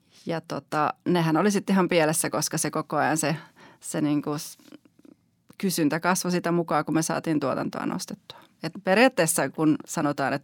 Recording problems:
none

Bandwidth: 17.5 kHz